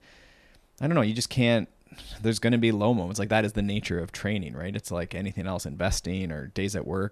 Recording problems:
none

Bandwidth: 13.5 kHz